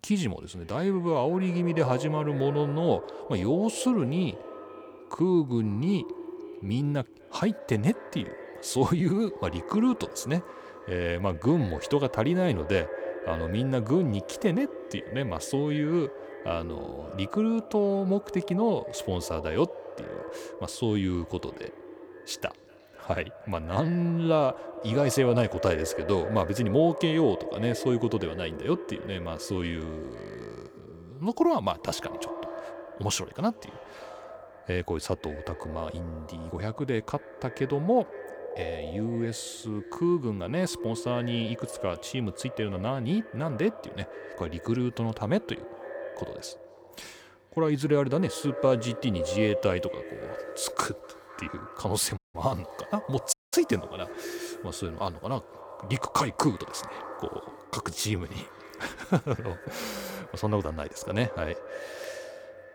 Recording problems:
echo of what is said; strong; throughout; 250 ms later, 10 dB below the speech
audio cutting out; at 52 s and at 53 s

